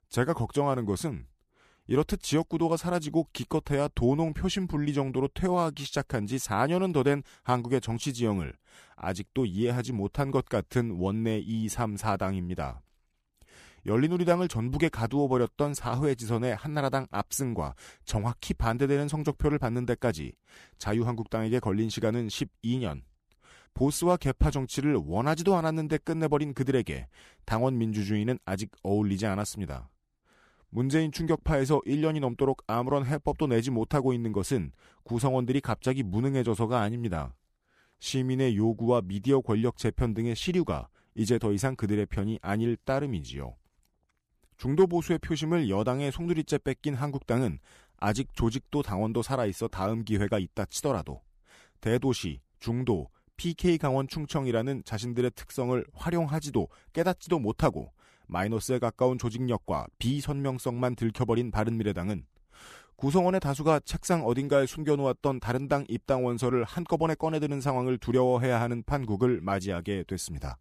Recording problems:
none

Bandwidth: 14.5 kHz